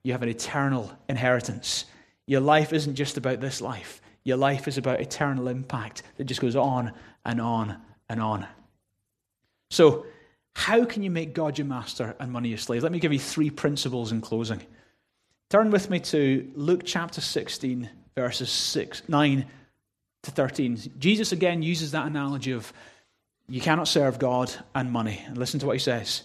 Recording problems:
none

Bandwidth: 13.5 kHz